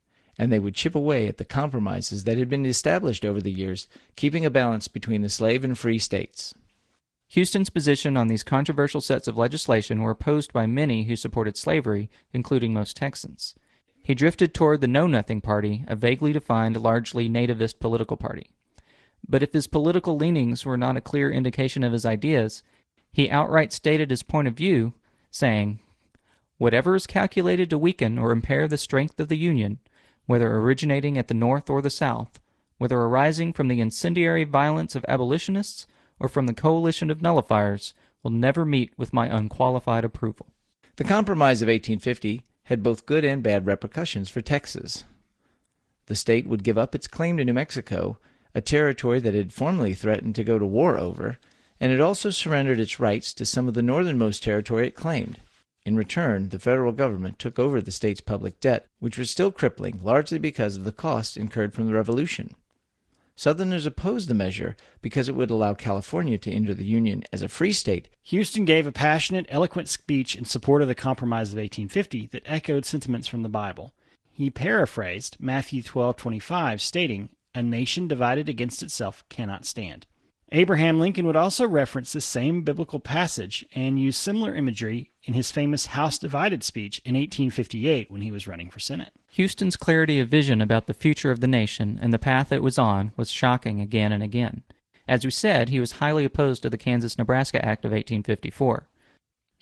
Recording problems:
garbled, watery; slightly

